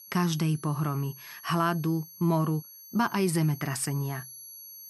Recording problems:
high-pitched whine; noticeable; throughout; 11.5 kHz, 15 dB below the speech

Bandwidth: 14.5 kHz